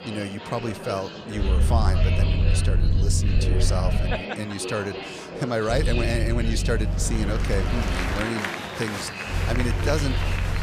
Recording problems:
murmuring crowd; loud; throughout; 3 dB below the speech
low rumble; noticeable; from 1.5 to 4 s, from 5.5 to 8 s and from 9.5 s on; 10 dB below the speech

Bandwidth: 14.5 kHz